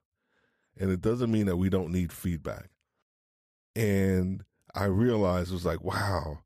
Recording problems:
none

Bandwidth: 14.5 kHz